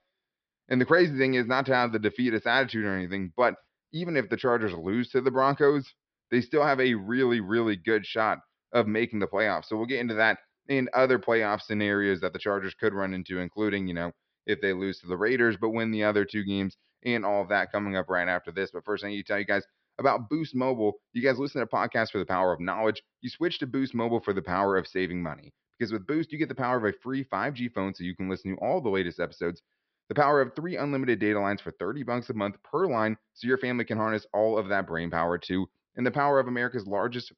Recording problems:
high frequencies cut off; noticeable; nothing above 5.5 kHz

